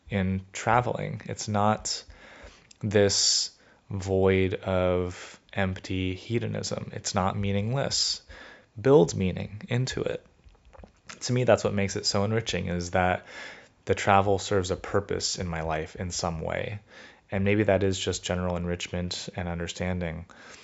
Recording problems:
high frequencies cut off; noticeable; nothing above 8 kHz

